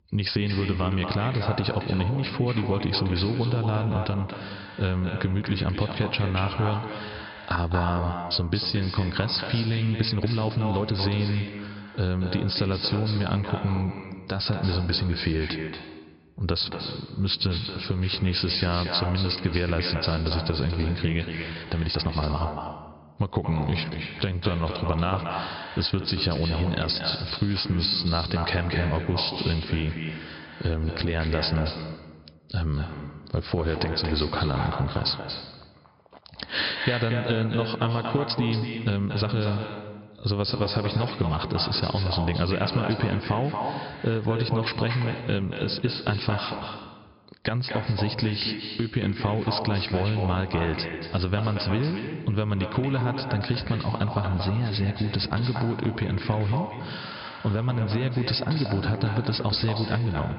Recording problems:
echo of what is said; strong; throughout; 230 ms later, 7 dB below the speech
high frequencies cut off; noticeable; nothing above 5.5 kHz
squashed, flat; somewhat
uneven, jittery; strongly; from 10 to 39 s

